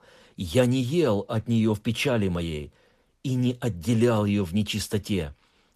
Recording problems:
garbled, watery; slightly; nothing above 14 kHz

